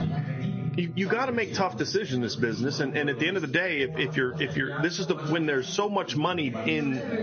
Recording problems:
high frequencies cut off; noticeable; nothing above 6.5 kHz
garbled, watery; slightly
squashed, flat; somewhat, background pumping
background chatter; loud; throughout; 2 voices, 9 dB below the speech
background music; noticeable; throughout; 15 dB below the speech

